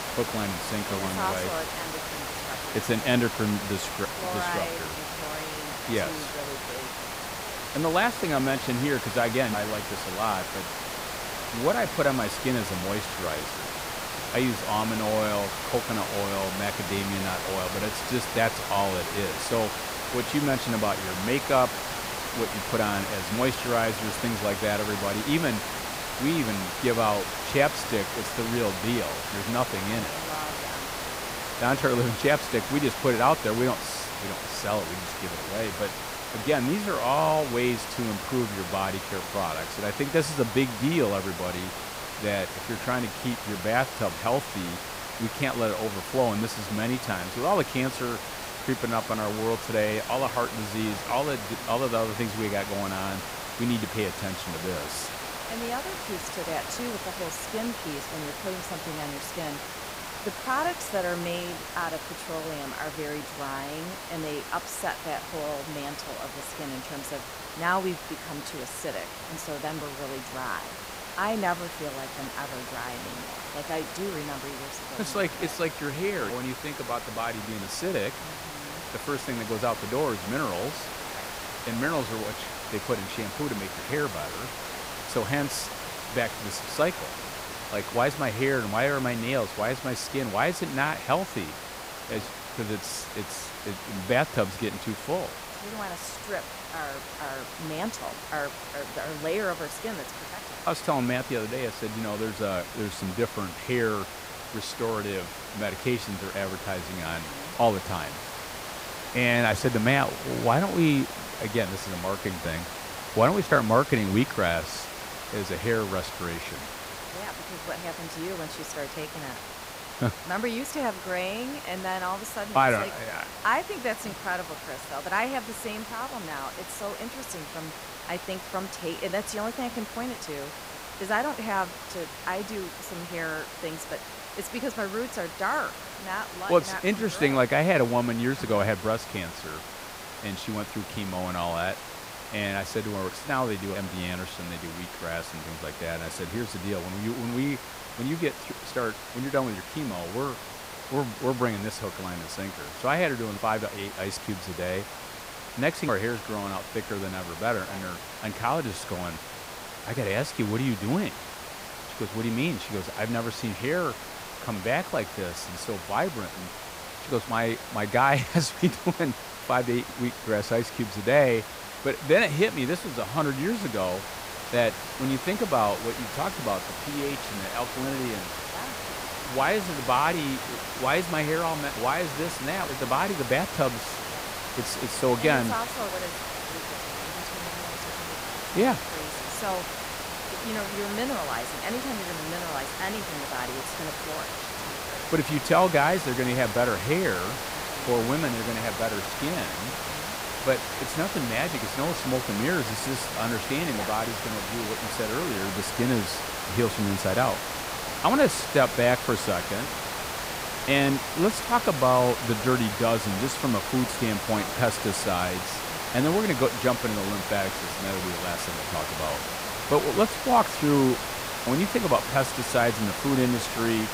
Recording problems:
hiss; loud; throughout; 5 dB below the speech

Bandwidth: 15.5 kHz